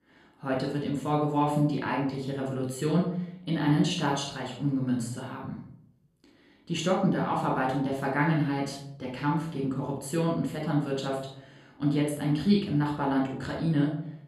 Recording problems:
off-mic speech; far
room echo; noticeable; dies away in 0.5 s

